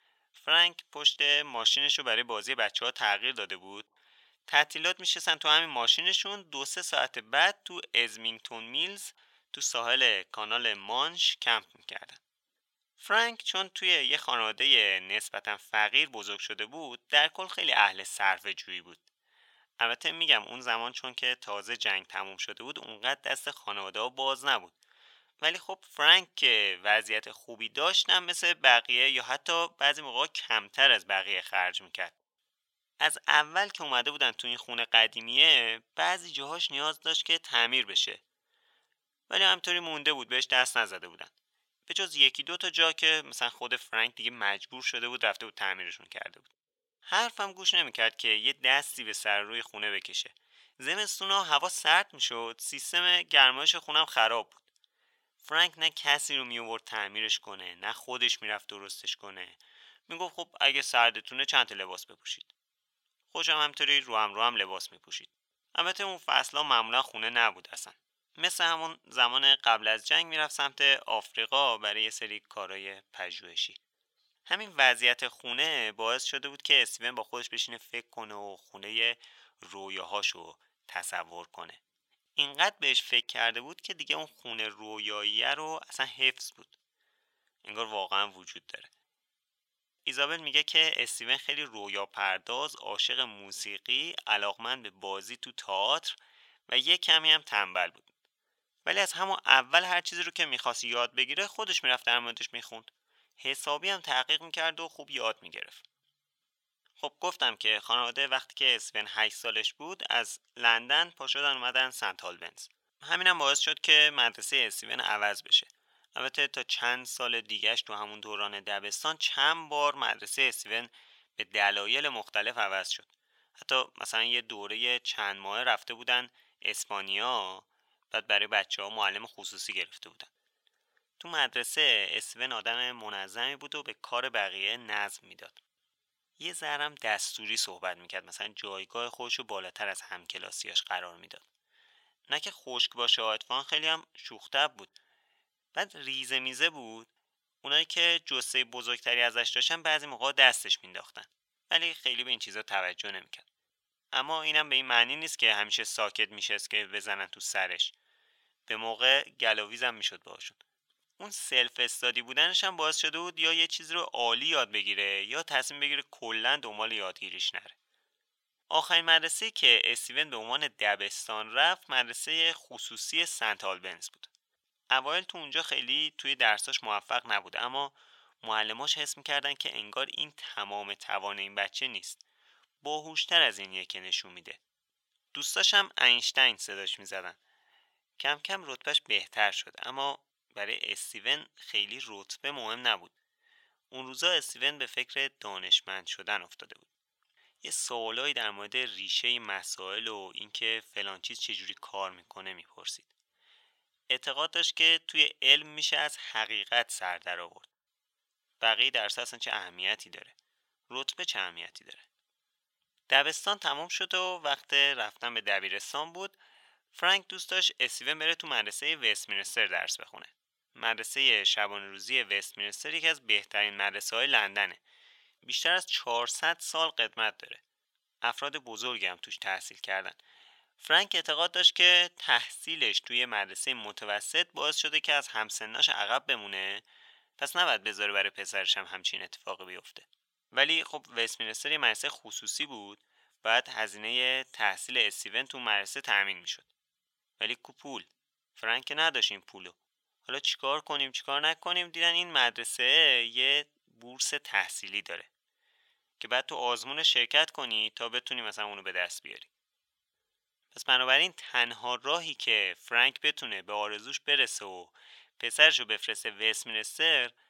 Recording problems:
thin; very; fading below 900 Hz

